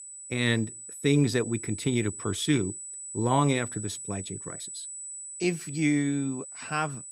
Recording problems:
high-pitched whine; loud; throughout; 8 kHz, 9 dB below the speech

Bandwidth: 15.5 kHz